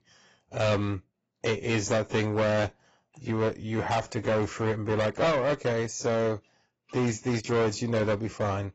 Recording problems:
distortion; heavy; 12% of the sound clipped
garbled, watery; badly; nothing above 7.5 kHz

